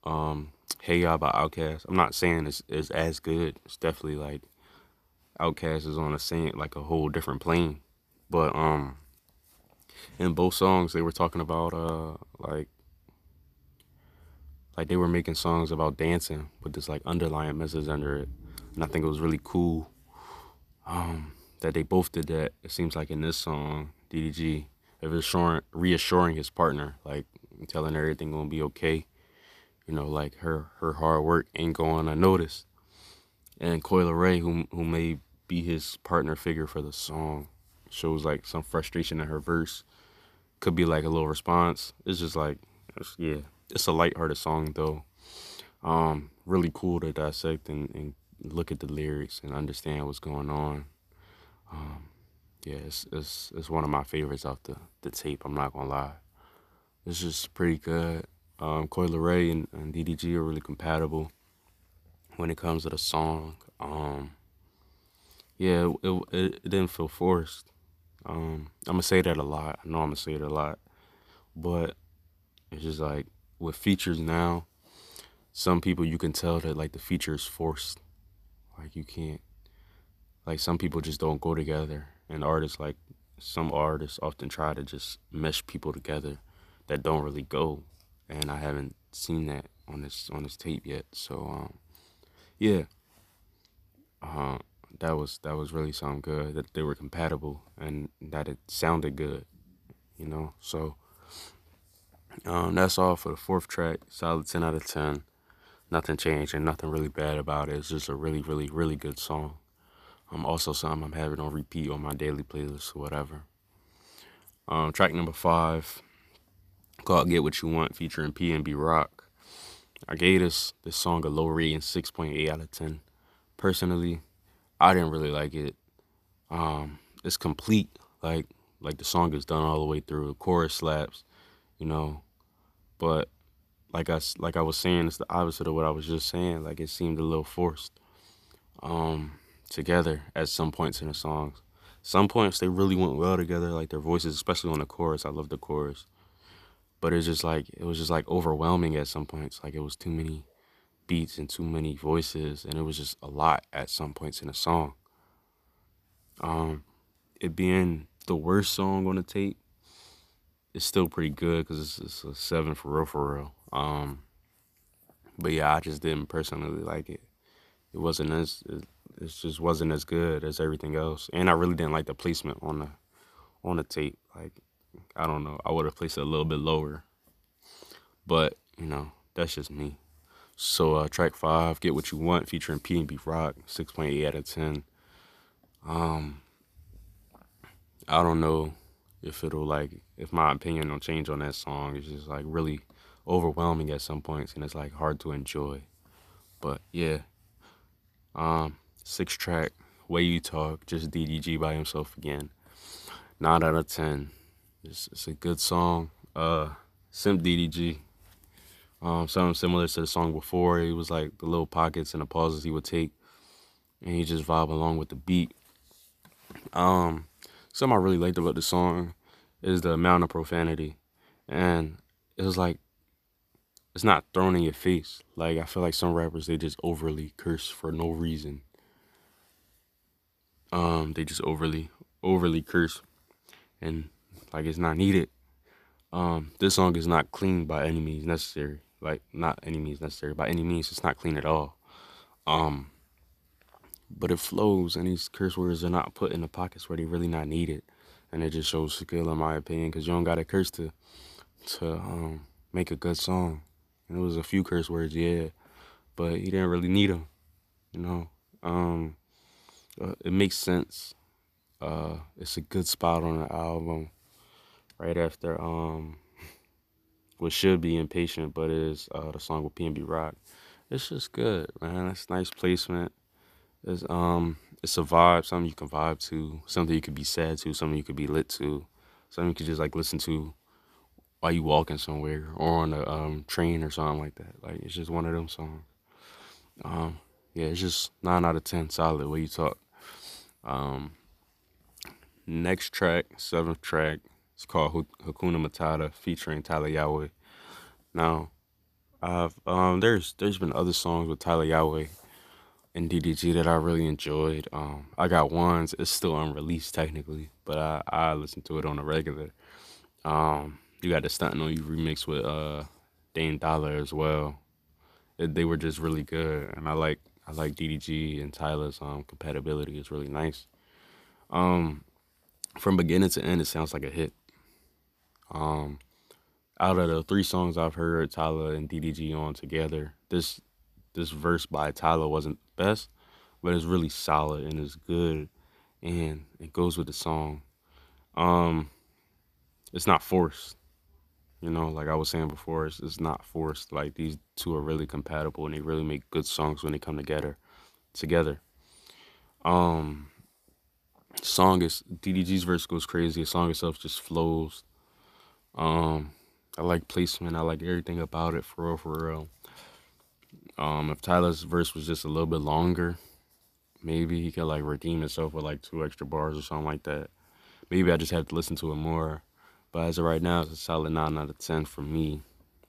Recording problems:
none

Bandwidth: 14.5 kHz